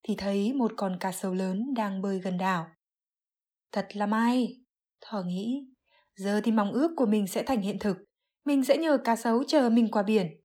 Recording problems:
none

